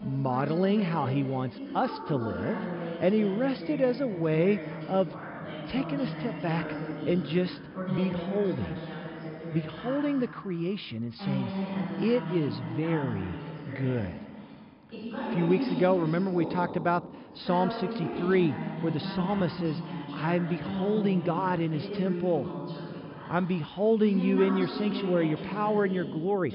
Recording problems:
high frequencies cut off; noticeable; nothing above 5.5 kHz
voice in the background; loud; throughout; 7 dB below the speech

